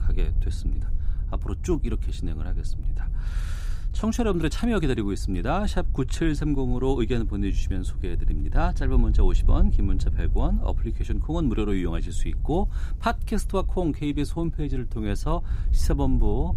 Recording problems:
wind noise on the microphone; occasional gusts; 20 dB below the speech

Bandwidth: 15.5 kHz